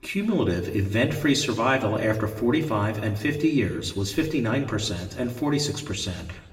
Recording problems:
room echo; slight; dies away in 0.8 s
off-mic speech; somewhat distant

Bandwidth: 16 kHz